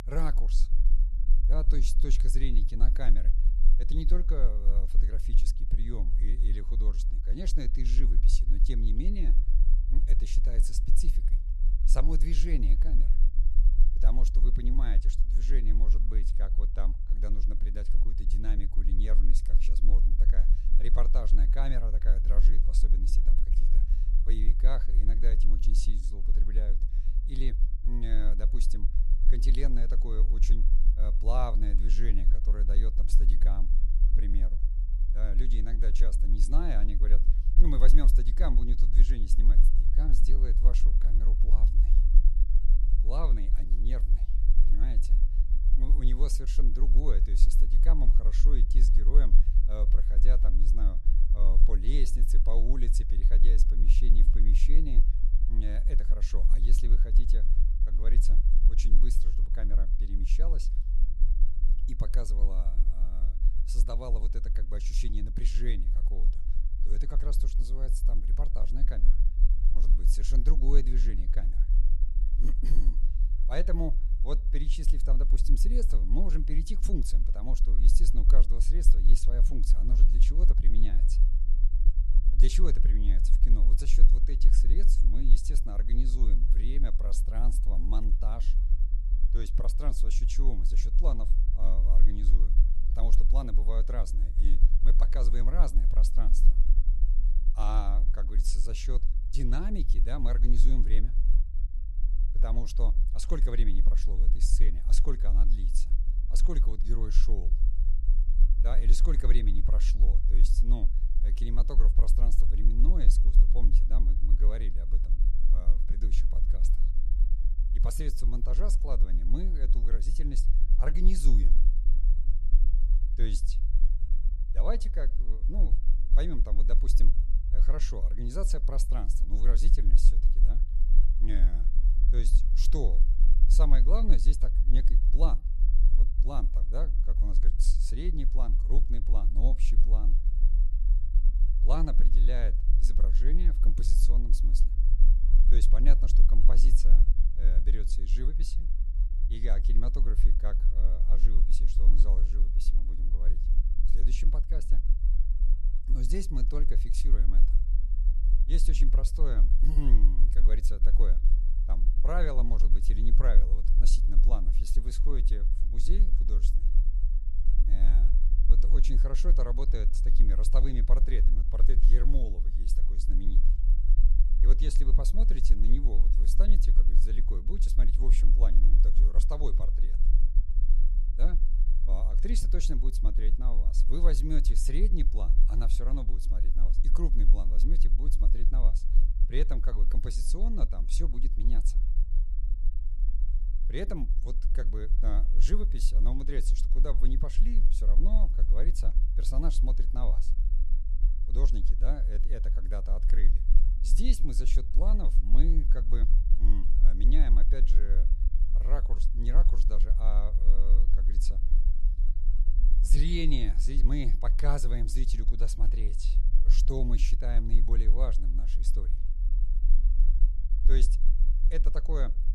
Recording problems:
low rumble; noticeable; throughout; 10 dB below the speech

